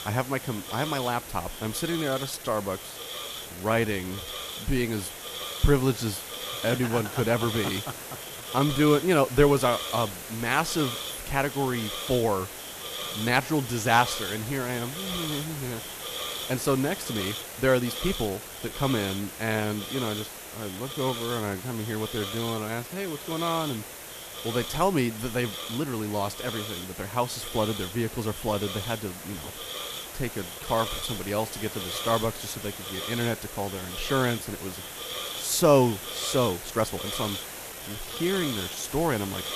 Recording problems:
hiss; loud; throughout; 7 dB below the speech
uneven, jittery; strongly; from 2 to 39 s

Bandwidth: 14.5 kHz